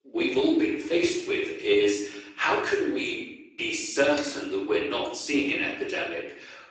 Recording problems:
off-mic speech; far
garbled, watery; badly; nothing above 8 kHz
room echo; noticeable; dies away in 0.7 s
thin; somewhat; fading below 300 Hz

